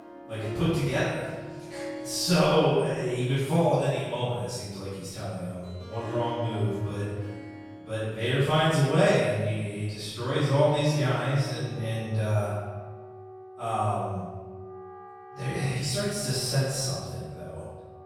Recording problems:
room echo; strong; dies away in 1.2 s
off-mic speech; far
background music; noticeable; throughout; 15 dB below the speech

